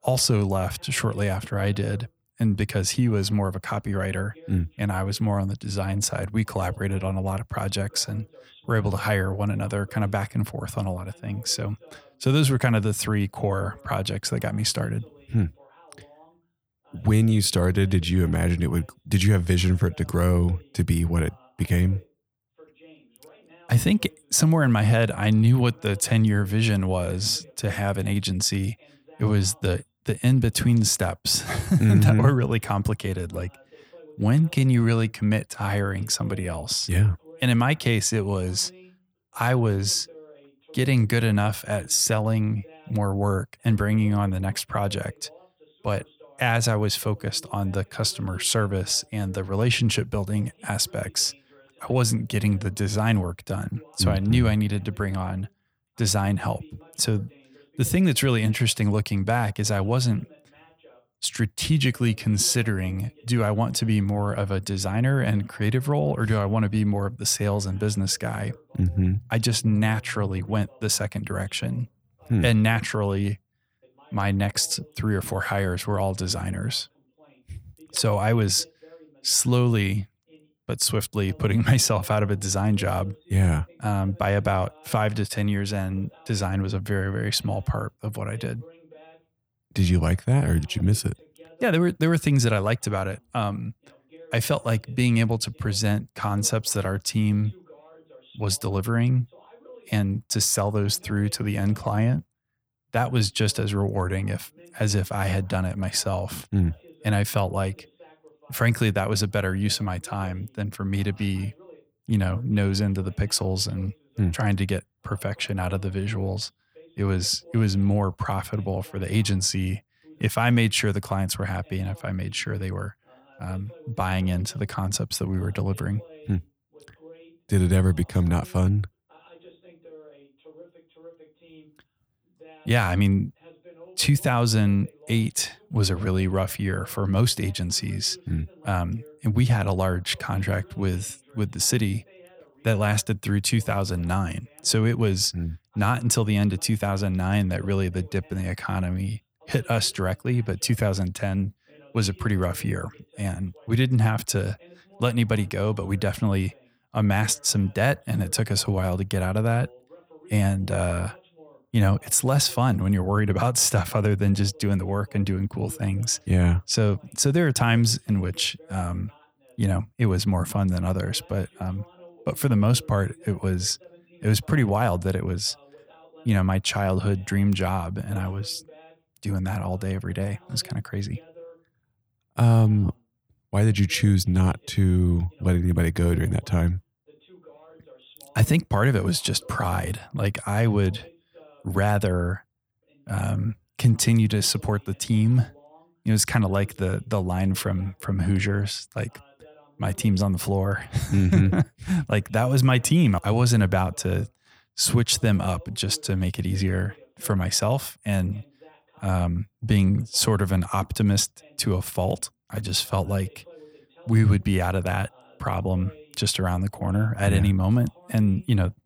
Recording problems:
voice in the background; faint; throughout; 30 dB below the speech

